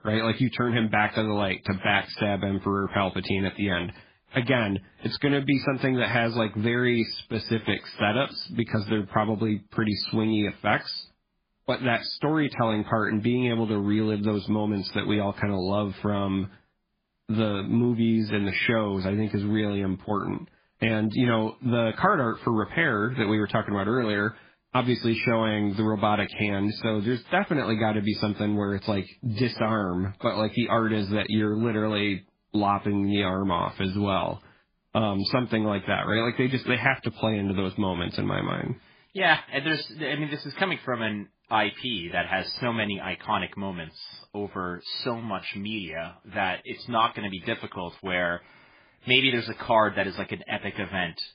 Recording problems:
garbled, watery; badly; nothing above 5 kHz

